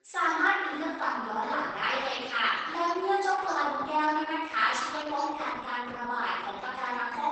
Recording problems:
room echo; strong; dies away in 1.1 s
off-mic speech; far
garbled, watery; badly; nothing above 8 kHz
echo of what is said; faint; throughout; 600 ms later, 25 dB below the speech
thin; very slightly; fading below 350 Hz
voice in the background; faint; throughout; 20 dB below the speech

